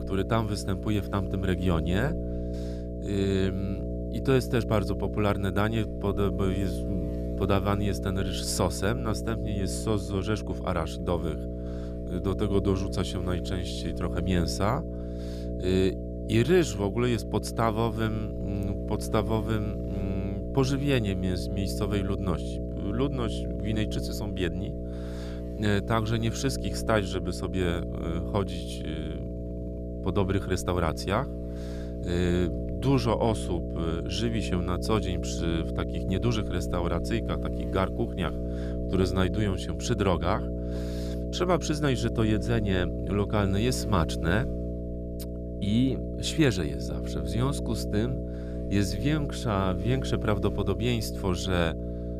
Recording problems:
electrical hum; loud; throughout; 60 Hz, 7 dB below the speech

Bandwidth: 14.5 kHz